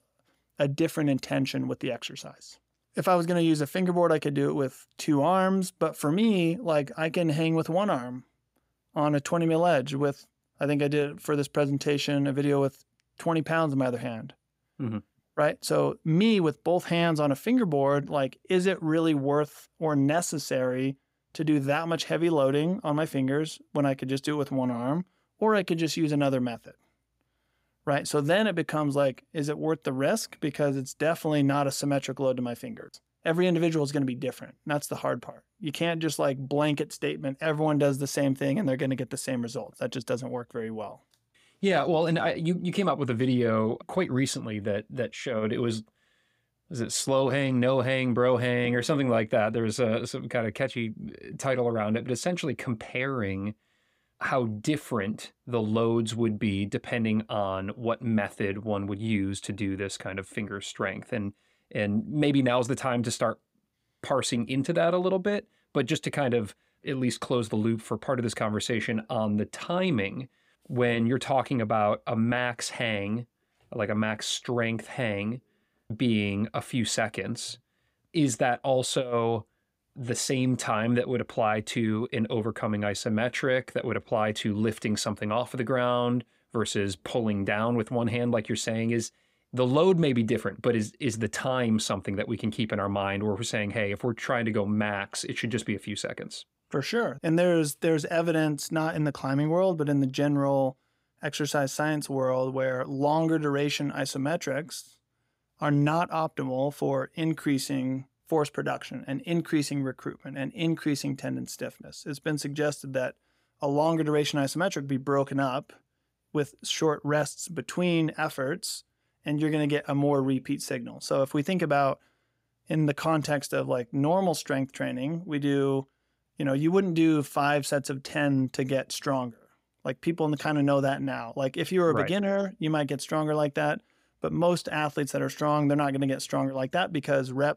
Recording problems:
none

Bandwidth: 15.5 kHz